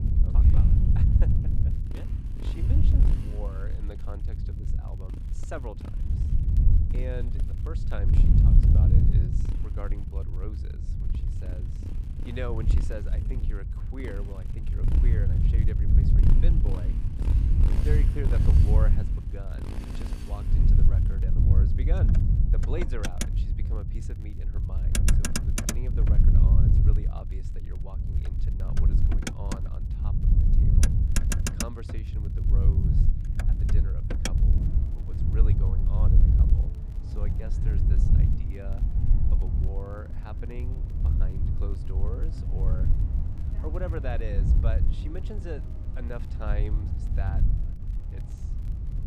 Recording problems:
traffic noise; very loud; throughout; 1 dB above the speech
wind noise on the microphone; heavy; 1 dB above the speech
crackle, like an old record; faint; 25 dB below the speech

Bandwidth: 15.5 kHz